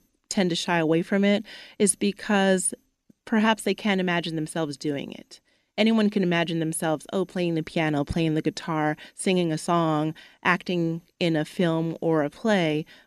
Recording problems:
none

